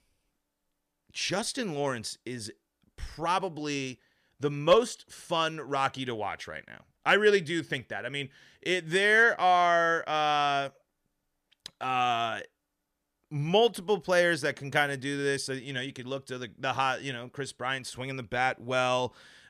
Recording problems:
none

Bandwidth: 14.5 kHz